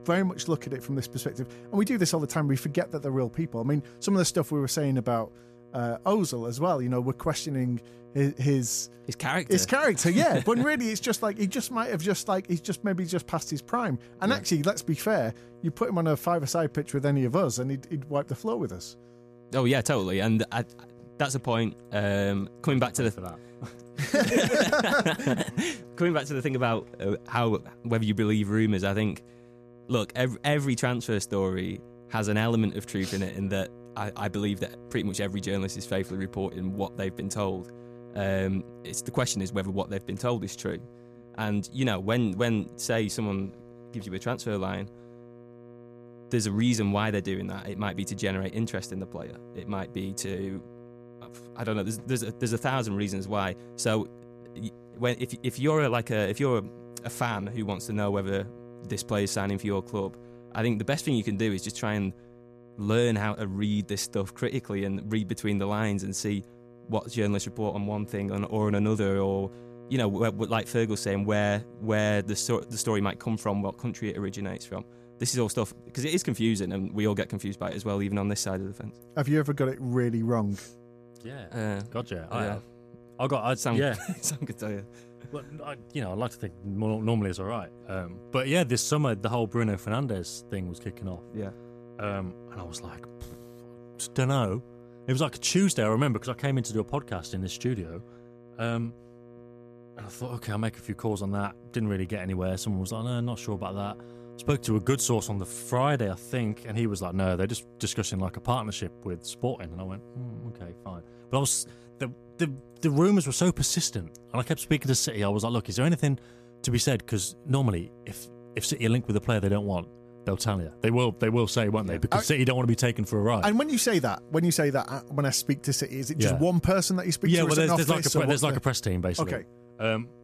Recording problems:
electrical hum; faint; throughout; 60 Hz, 20 dB below the speech

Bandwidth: 14.5 kHz